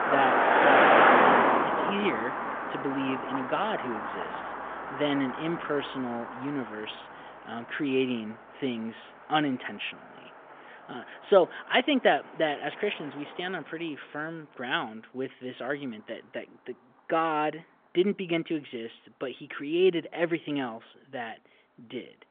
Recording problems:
phone-call audio; nothing above 3.5 kHz
traffic noise; very loud; throughout; 5 dB above the speech

